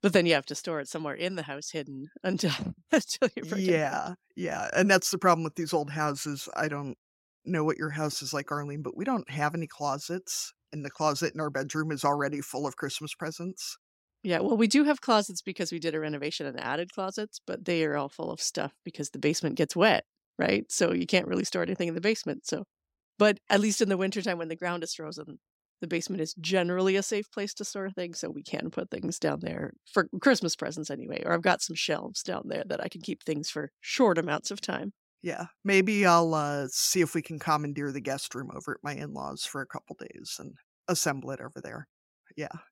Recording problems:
none

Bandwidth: 16 kHz